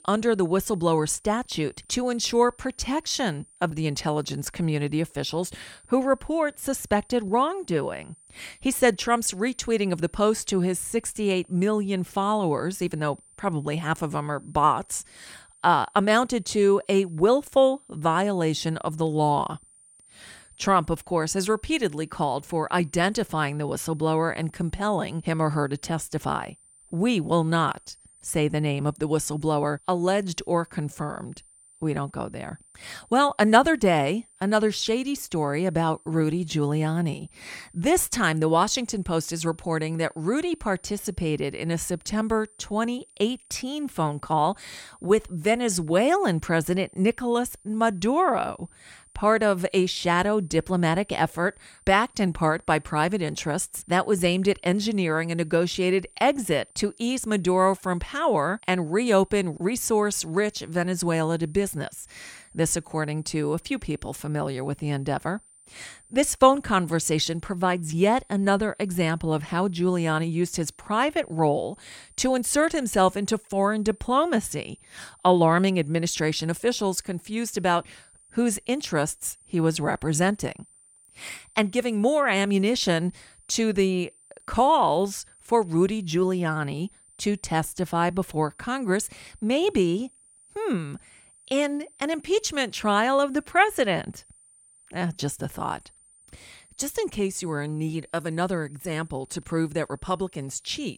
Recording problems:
high-pitched whine; faint; throughout; 9 kHz, 30 dB below the speech

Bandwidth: 18.5 kHz